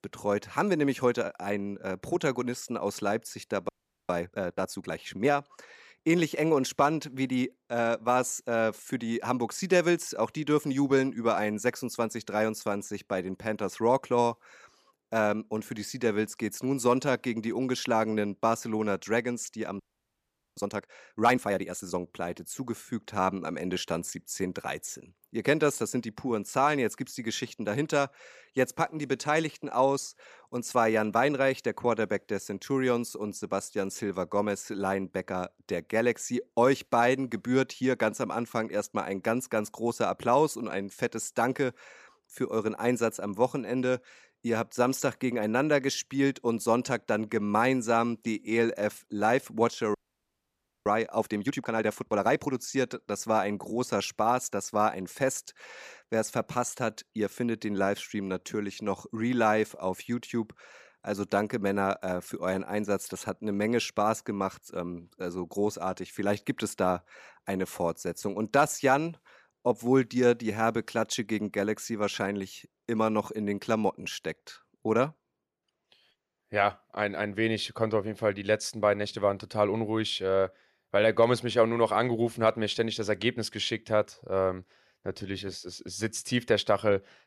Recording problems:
audio freezing; at 3.5 s, at 20 s for 1 s and at 50 s for 1 s

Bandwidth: 14.5 kHz